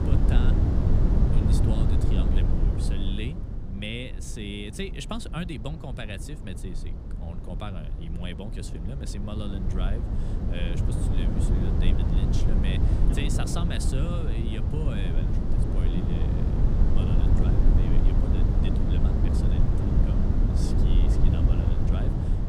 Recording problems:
wind noise on the microphone; heavy; 3 dB above the speech

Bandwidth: 15 kHz